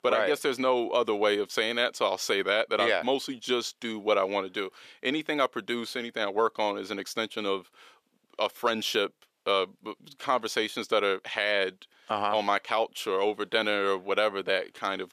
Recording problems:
thin; somewhat; fading below 450 Hz

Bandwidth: 14.5 kHz